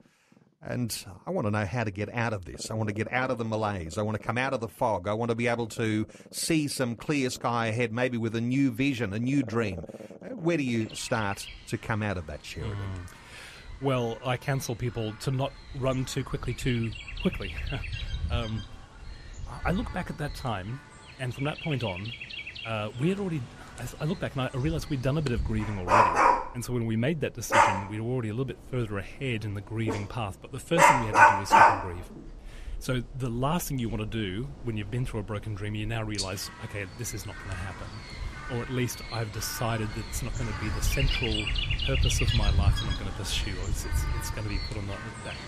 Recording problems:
animal sounds; very loud; throughout; 3 dB above the speech

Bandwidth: 14.5 kHz